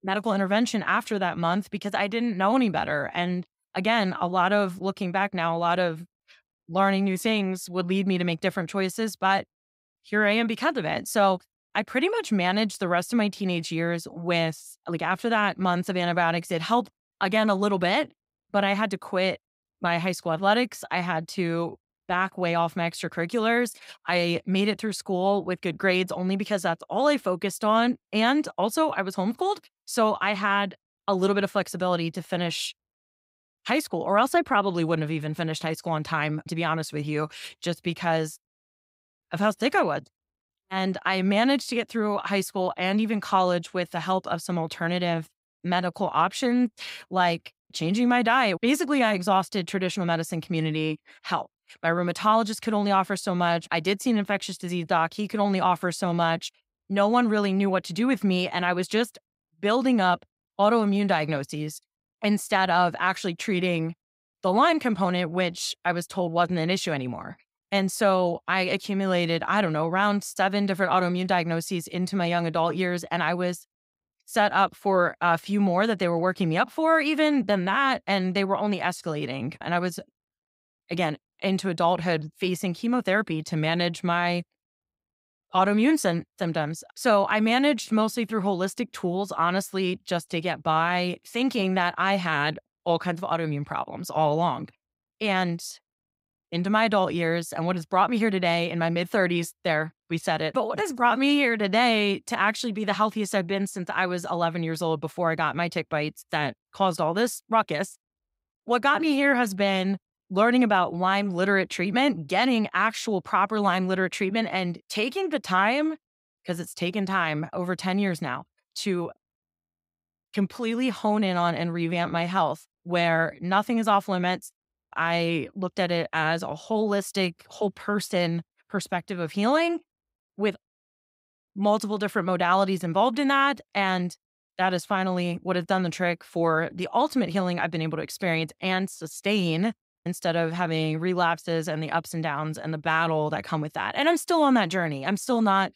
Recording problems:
none

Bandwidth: 15.5 kHz